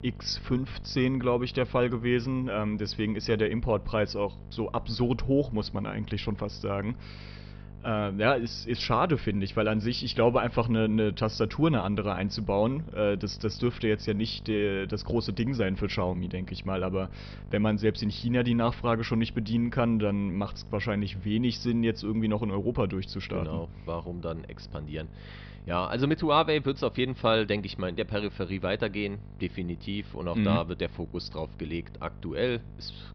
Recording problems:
high frequencies cut off; noticeable; nothing above 5.5 kHz
electrical hum; faint; throughout; 50 Hz, 25 dB below the speech

